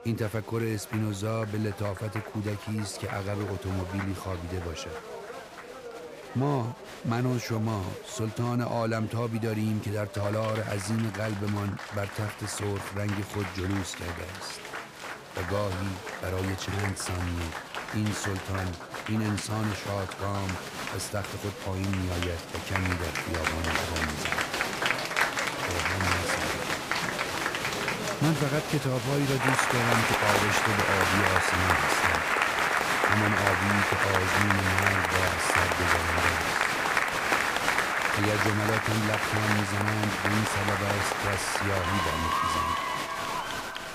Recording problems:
crowd noise; very loud; throughout; 4 dB above the speech
household noises; faint; throughout; 20 dB below the speech

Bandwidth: 15 kHz